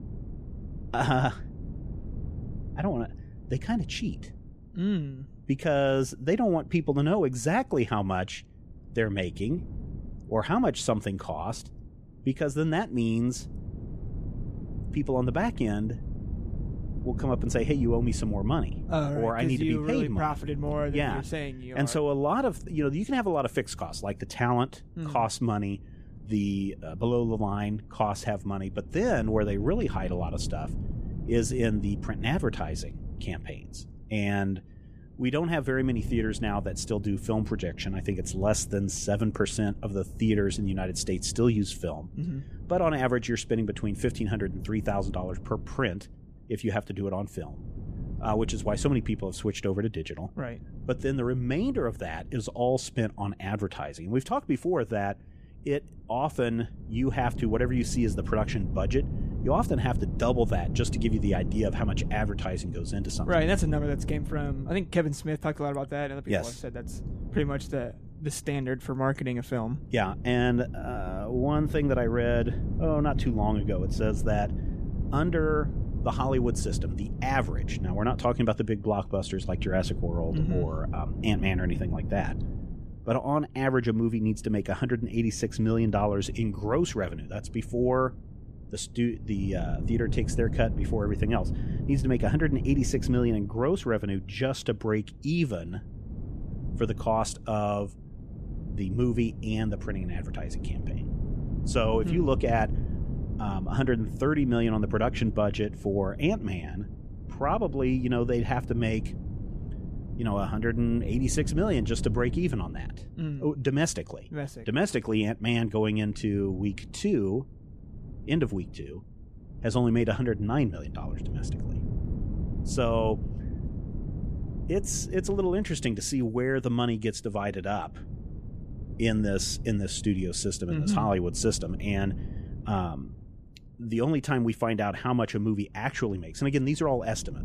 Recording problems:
wind noise on the microphone; occasional gusts; 15 dB below the speech

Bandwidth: 14.5 kHz